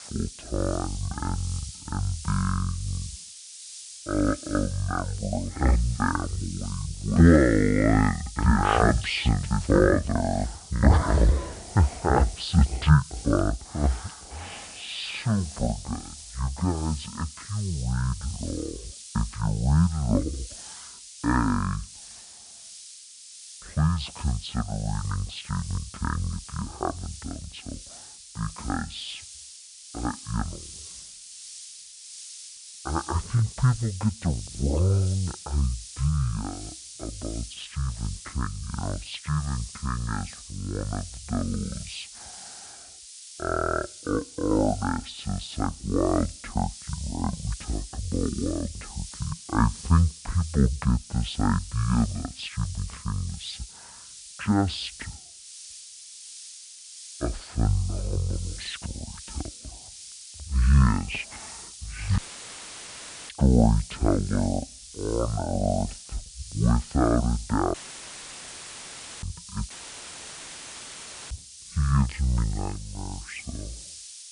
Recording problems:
wrong speed and pitch; too slow and too low; 0.5 times normal speed
hiss; noticeable; throughout; 15 dB below the speech
audio cutting out; filled with static; at 1:02 for 1 s, at 1:08 for 1.5 s and at 1:10 for 1.5 s

